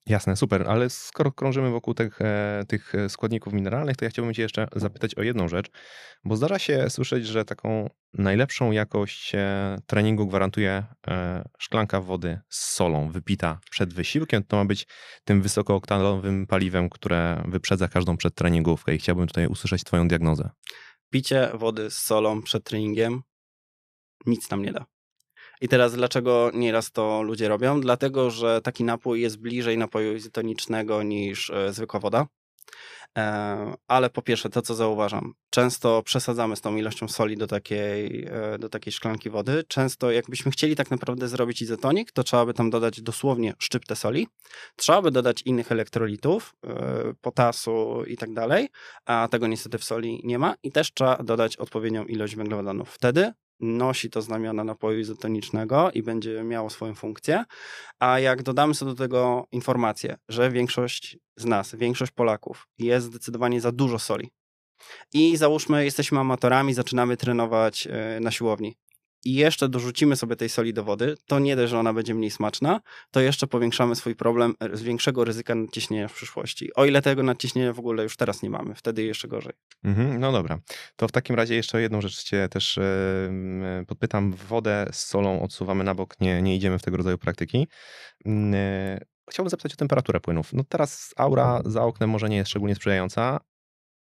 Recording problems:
none

